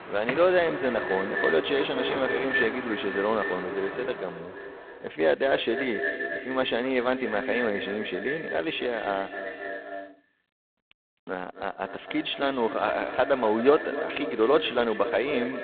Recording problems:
phone-call audio; poor line; nothing above 3.5 kHz
echo of what is said; strong; throughout; 260 ms later, 6 dB below the speech
traffic noise; loud; until 5 s; 10 dB below the speech

